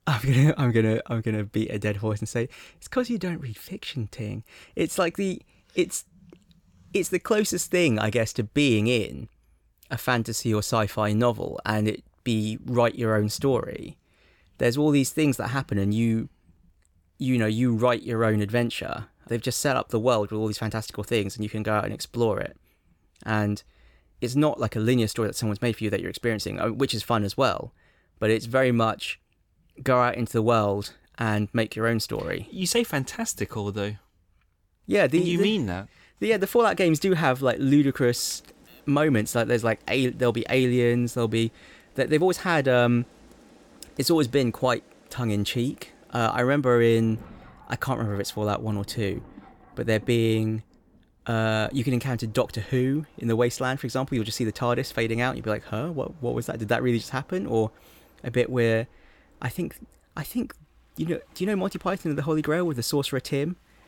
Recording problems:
rain or running water; faint; from 38 s on; 30 dB below the speech

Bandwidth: 18.5 kHz